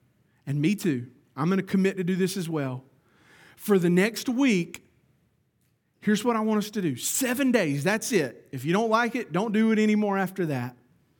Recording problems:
none

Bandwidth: 17.5 kHz